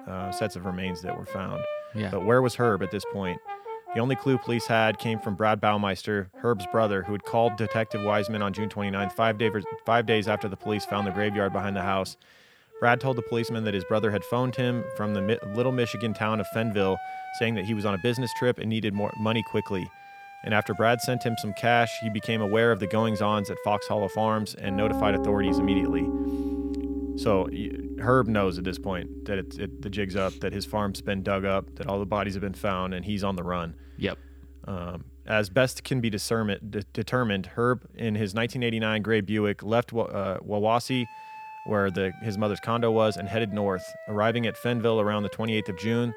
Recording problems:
background music; loud; throughout; 9 dB below the speech

